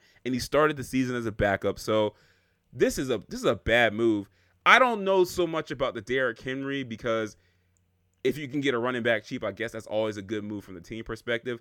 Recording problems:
none

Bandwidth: 18 kHz